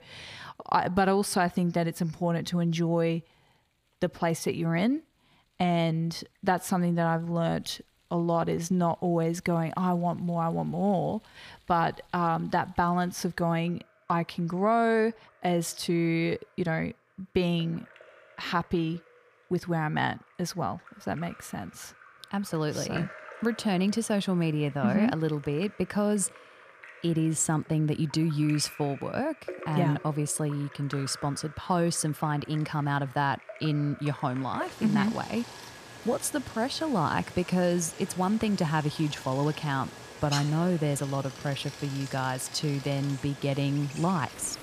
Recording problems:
rain or running water; noticeable; throughout; 15 dB below the speech

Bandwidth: 15 kHz